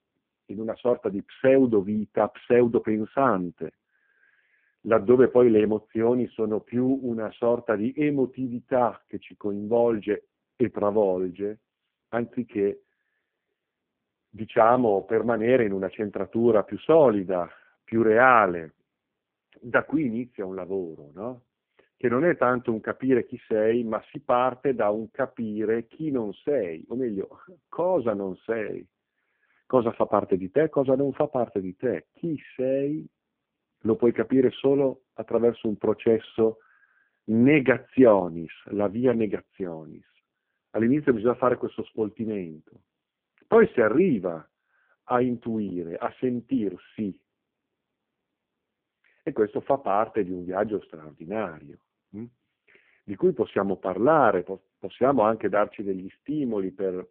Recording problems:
phone-call audio; poor line

